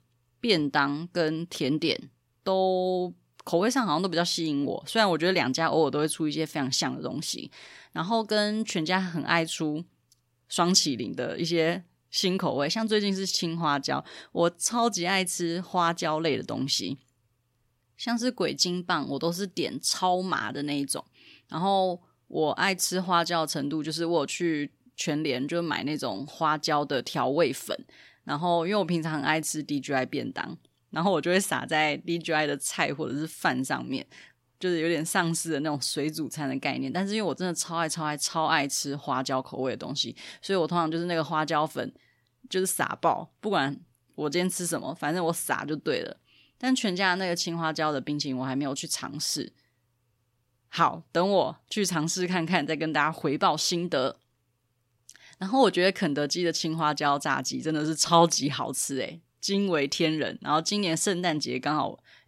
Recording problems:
none

